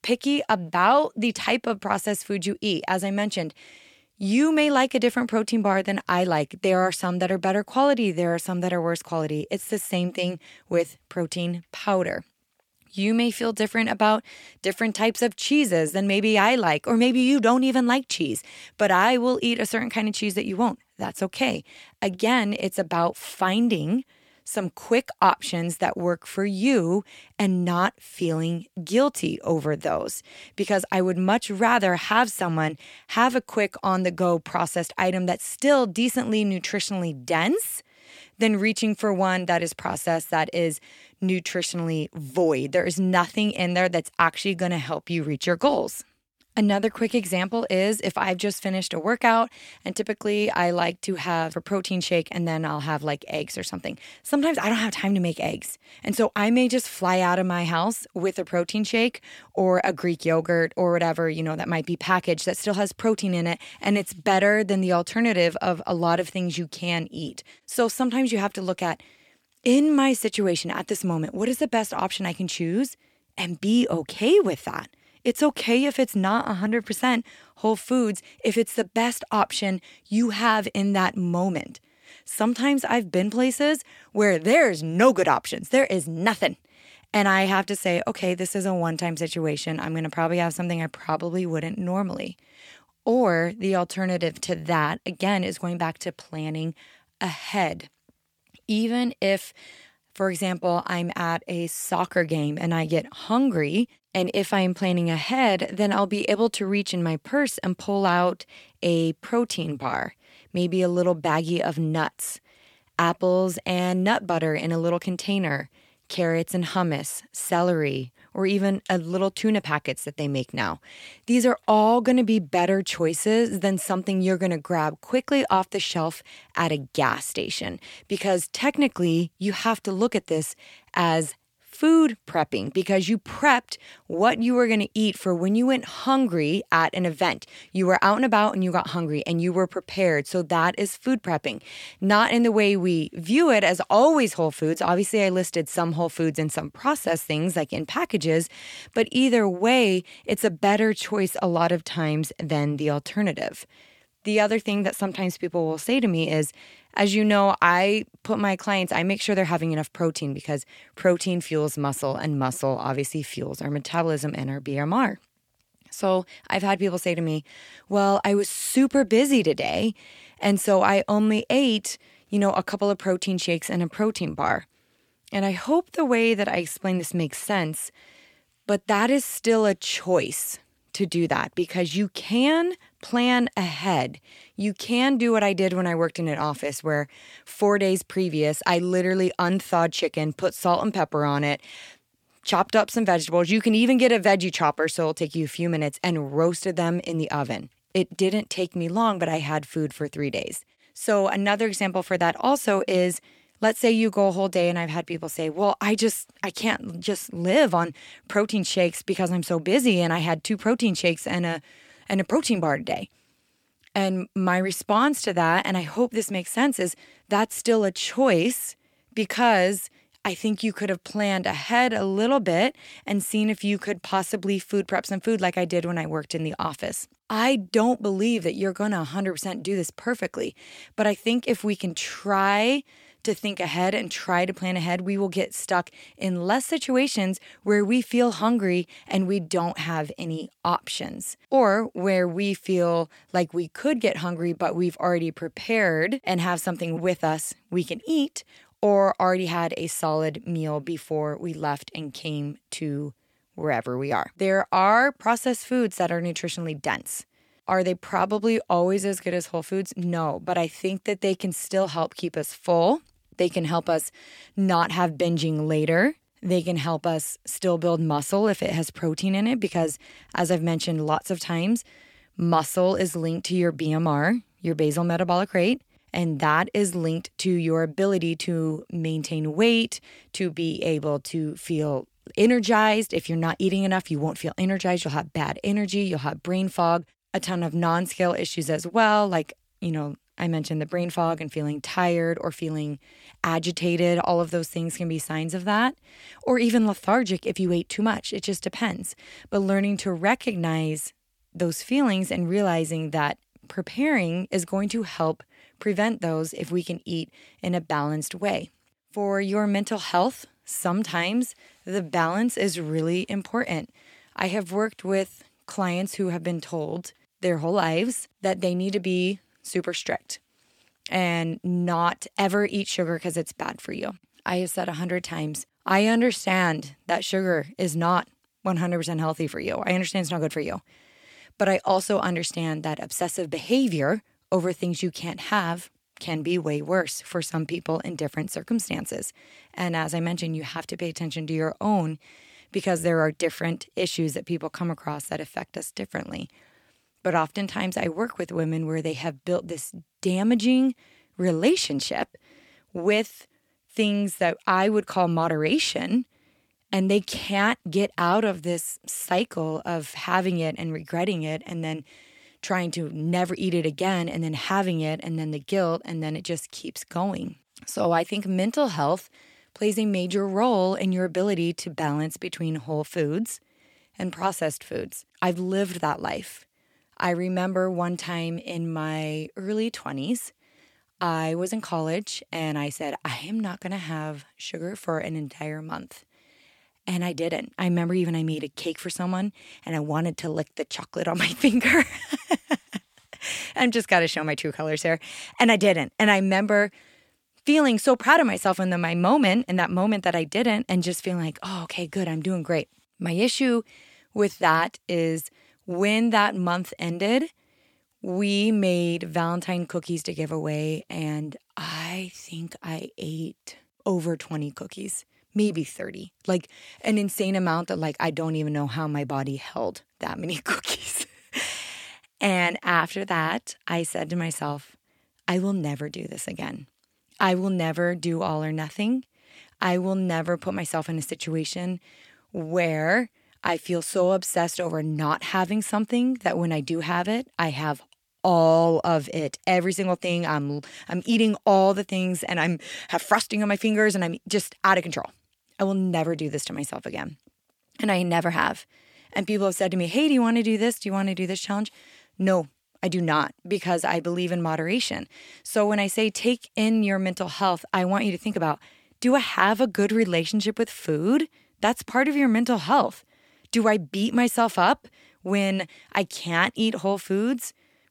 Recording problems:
none

